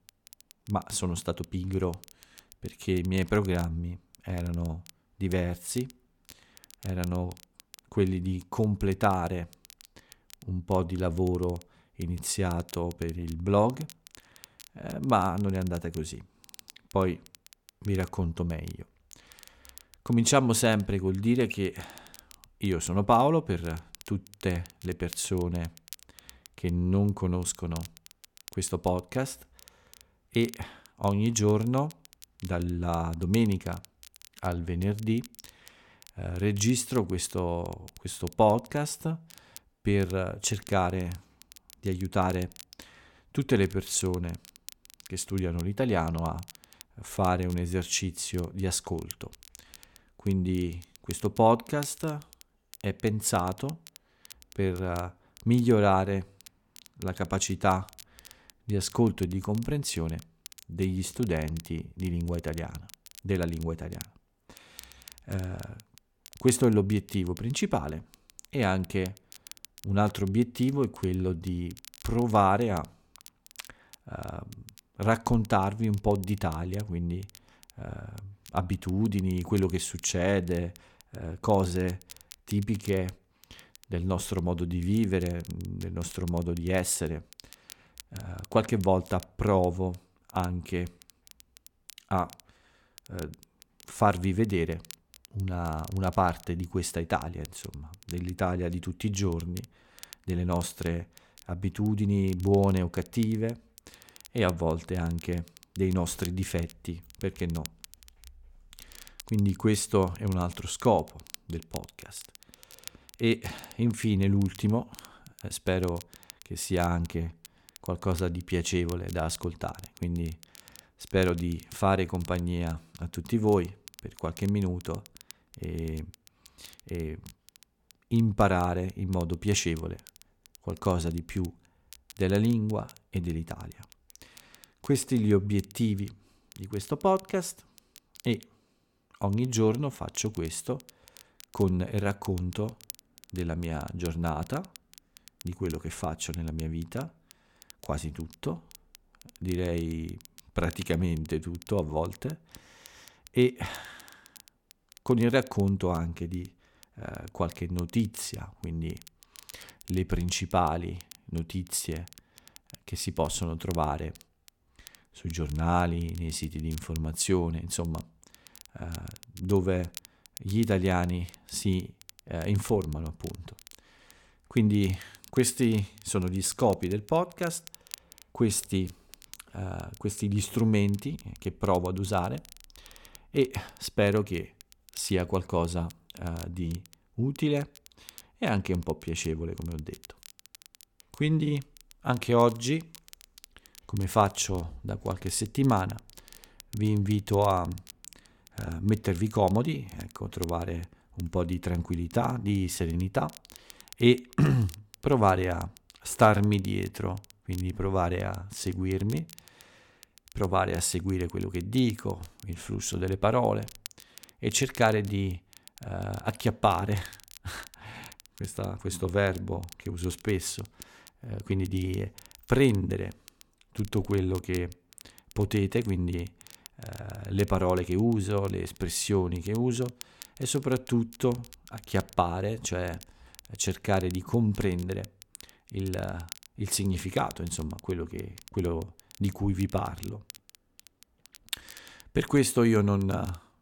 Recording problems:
crackle, like an old record; faint; 20 dB below the speech

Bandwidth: 17.5 kHz